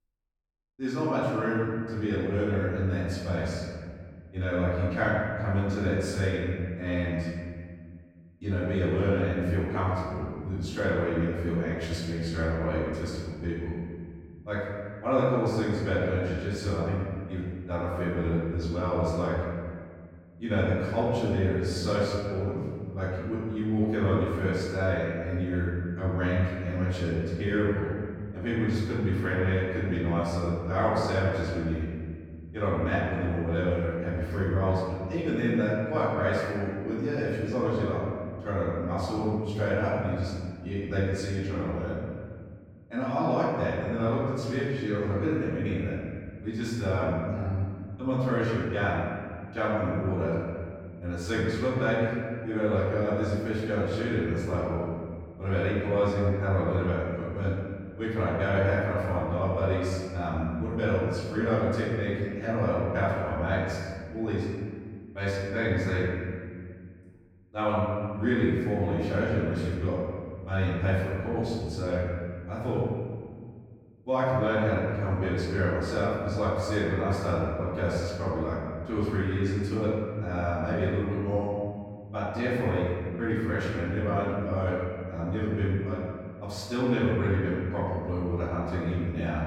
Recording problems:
room echo; strong; dies away in 2 s
off-mic speech; far

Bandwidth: 18 kHz